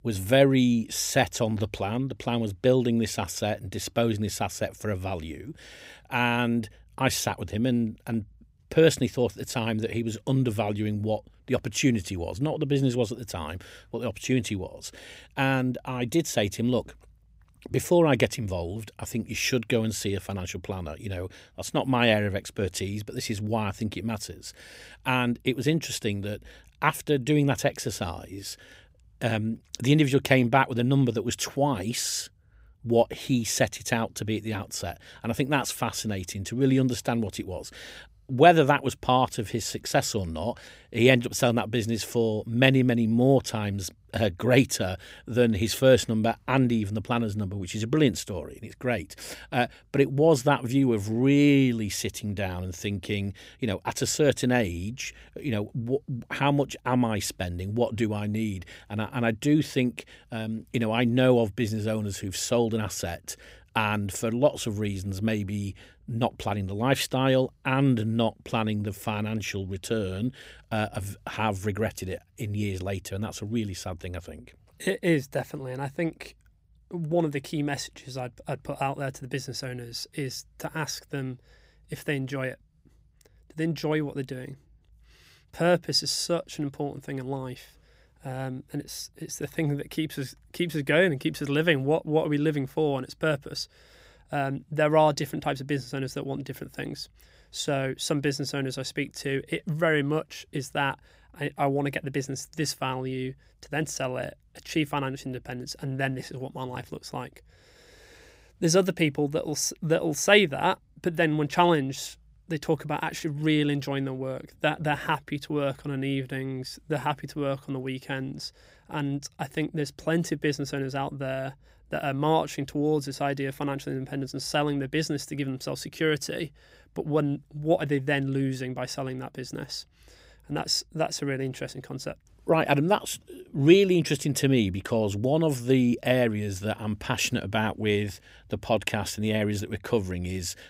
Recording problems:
none

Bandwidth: 15.5 kHz